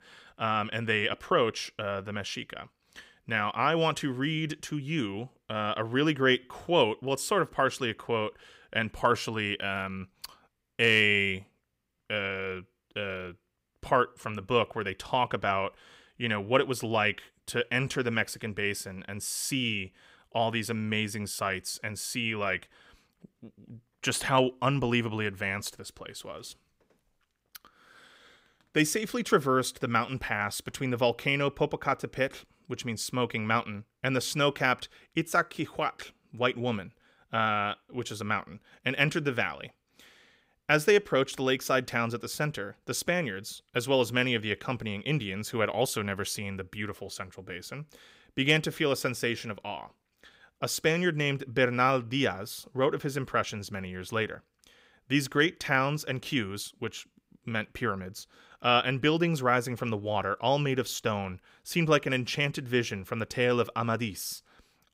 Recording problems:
none

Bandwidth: 15.5 kHz